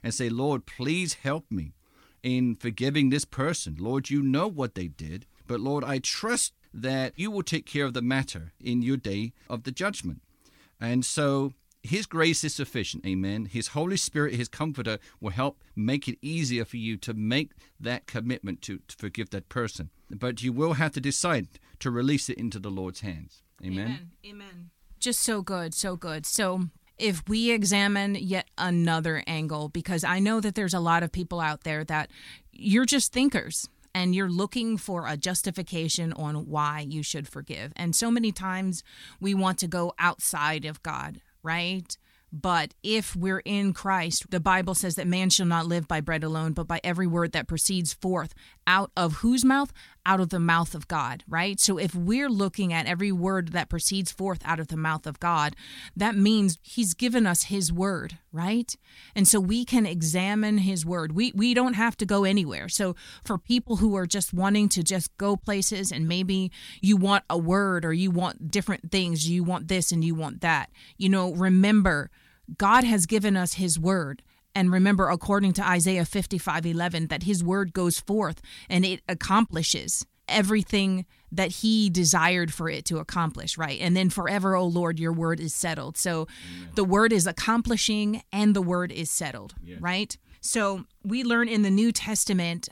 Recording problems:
none

